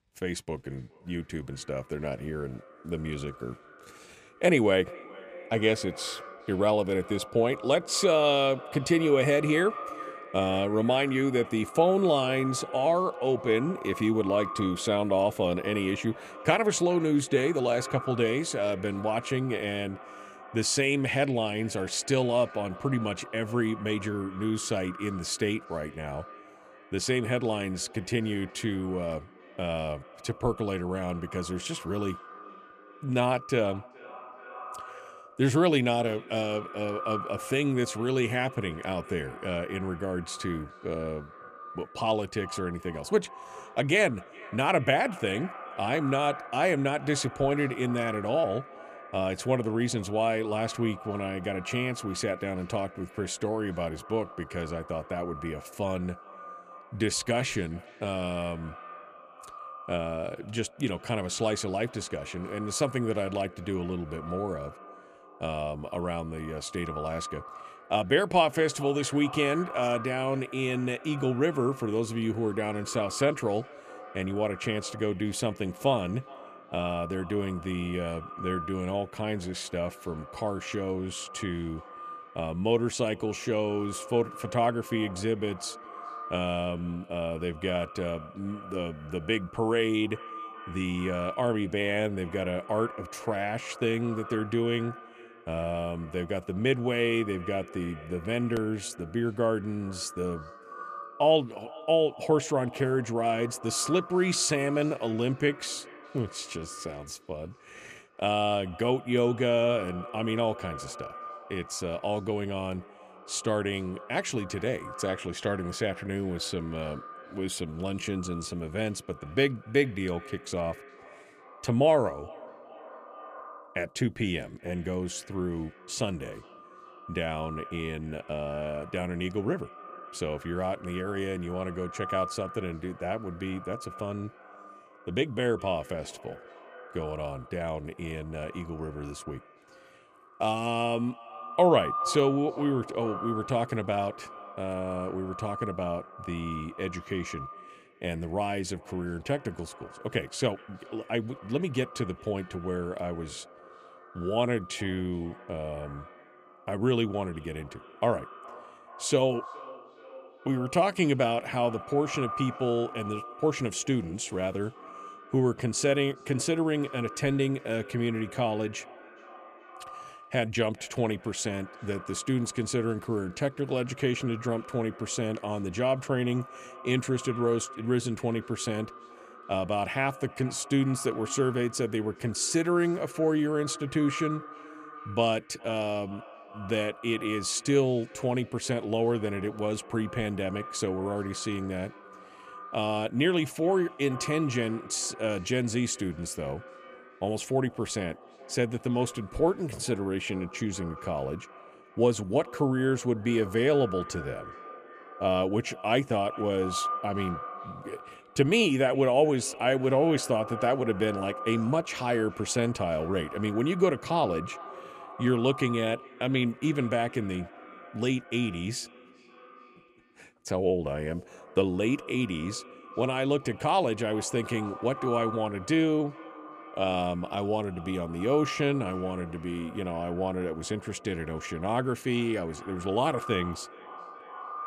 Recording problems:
echo of what is said; noticeable; throughout; 420 ms later, 15 dB below the speech

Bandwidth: 14.5 kHz